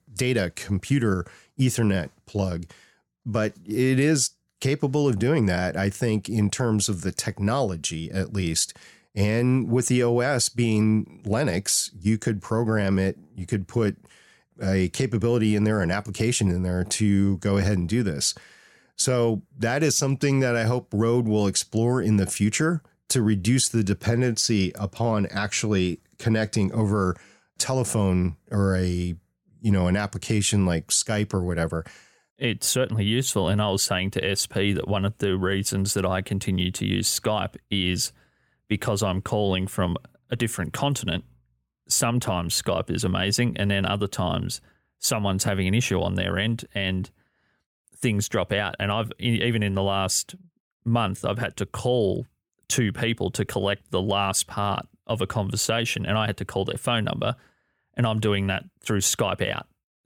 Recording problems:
none

